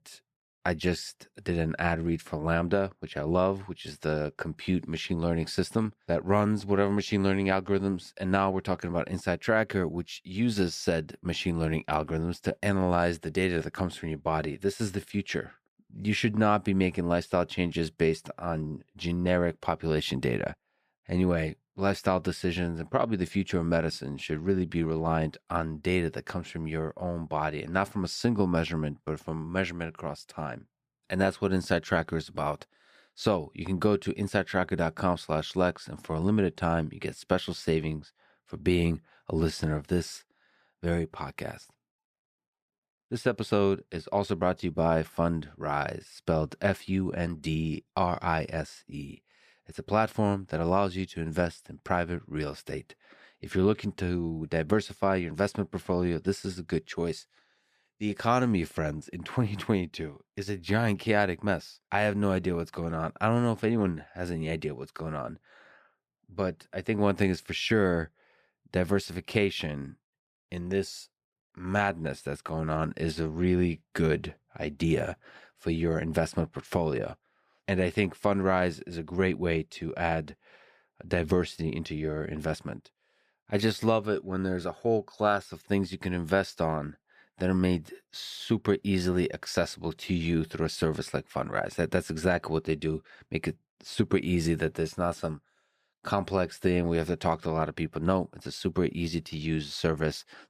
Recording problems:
none

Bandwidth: 15 kHz